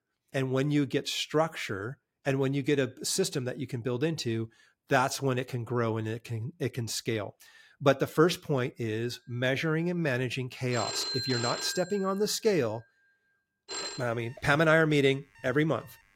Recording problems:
alarms or sirens; loud; from 9.5 s on; 5 dB below the speech

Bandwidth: 16.5 kHz